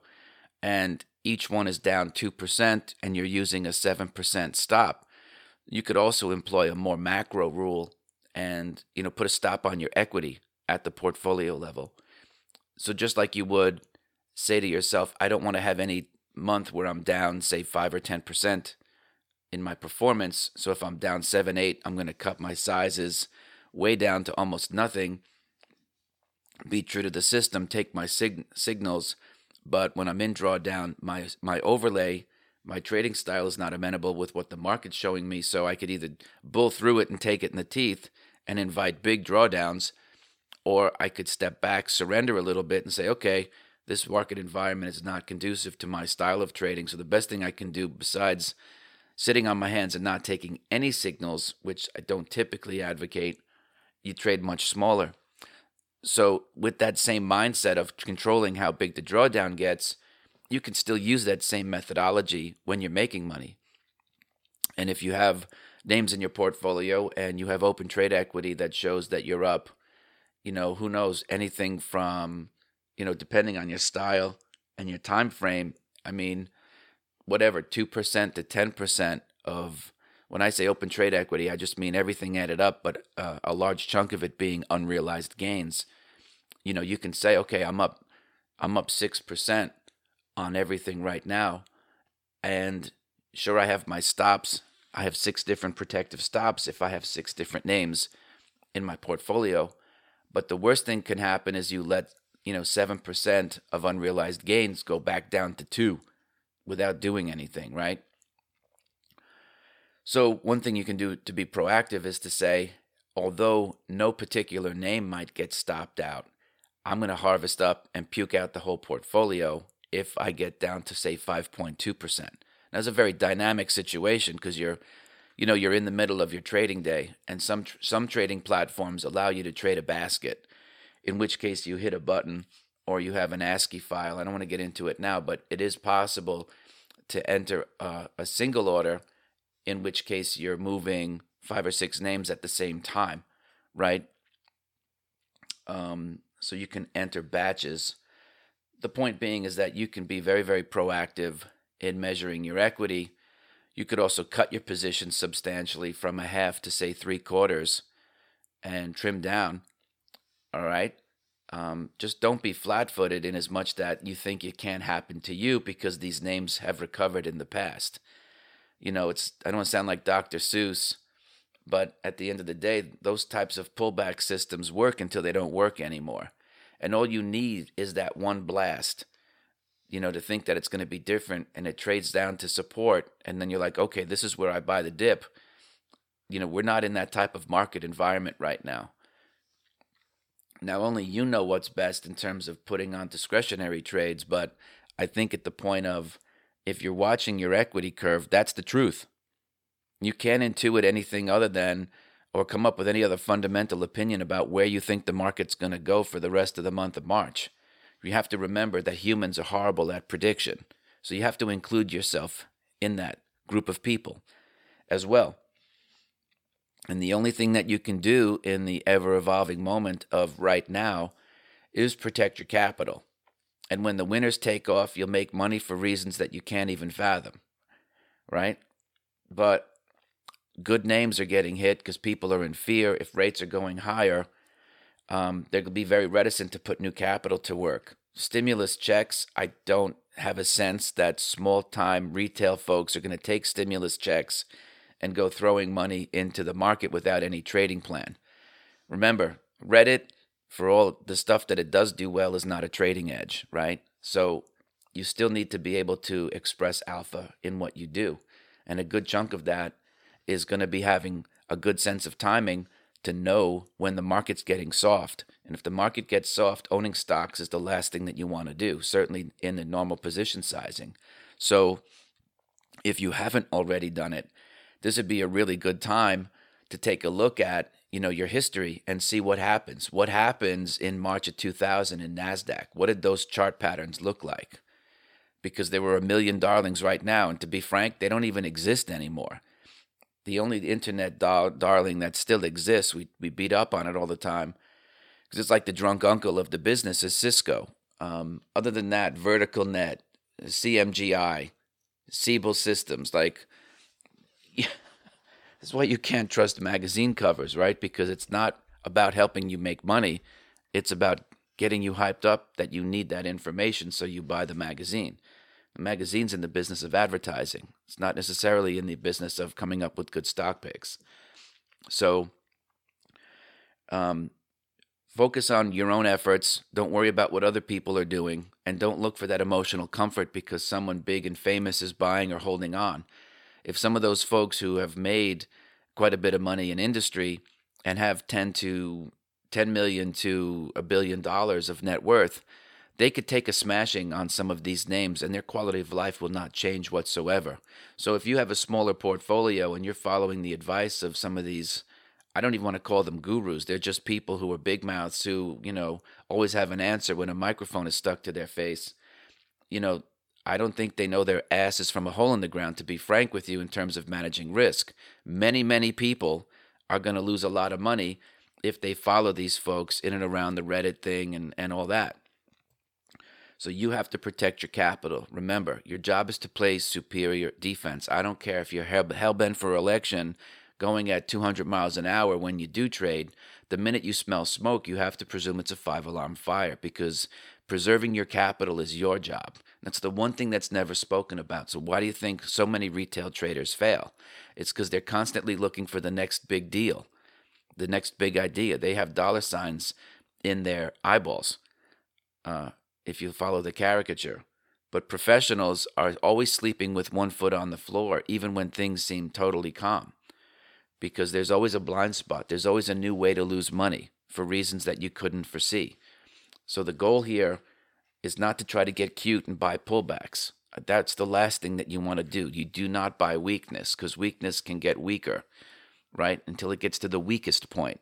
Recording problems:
none

